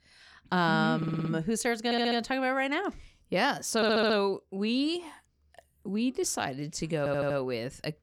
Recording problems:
audio stuttering; 4 times, first at 1 s

